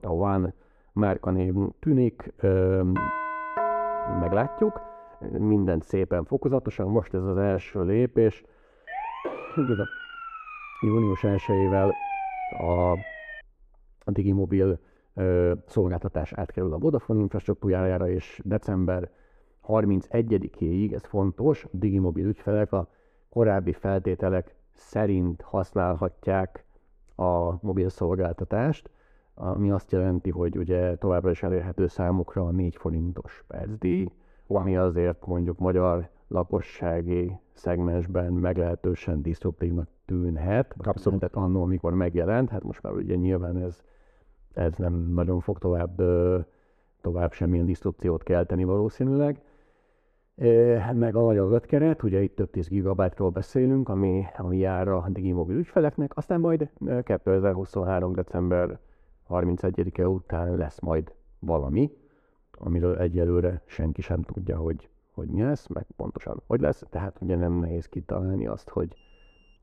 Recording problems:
muffled; very; fading above 2 kHz
doorbell; noticeable; from 3 to 5 s; peak level with the speech
uneven, jittery; strongly; from 7.5 s to 1:08
siren; noticeable; from 9 to 13 s; peak 5 dB below the speech
alarm; very faint; at 1:09; peak 35 dB below the speech

